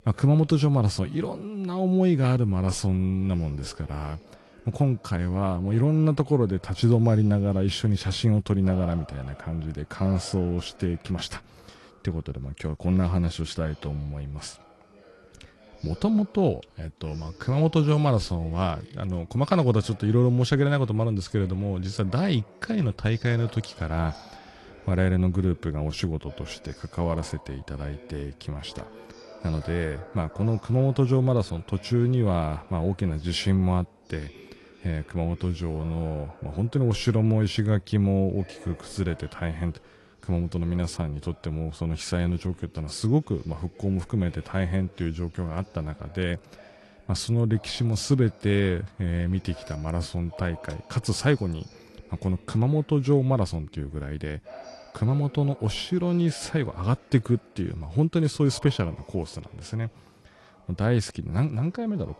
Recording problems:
garbled, watery; slightly; nothing above 11 kHz
background chatter; faint; throughout; 2 voices, 25 dB below the speech

